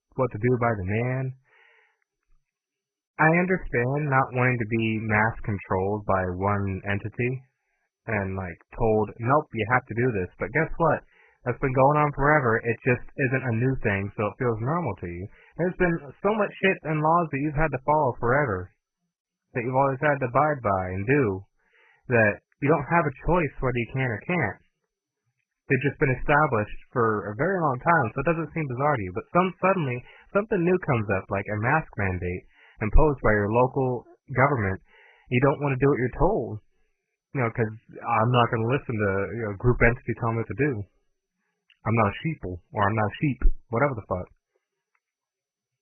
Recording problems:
garbled, watery; badly; nothing above 2.5 kHz

